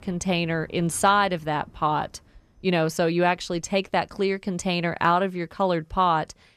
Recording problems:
animal sounds; faint; throughout; 30 dB below the speech

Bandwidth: 14.5 kHz